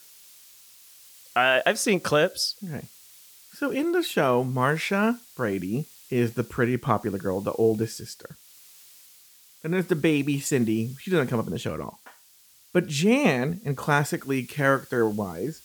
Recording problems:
hiss; faint; throughout; 25 dB below the speech

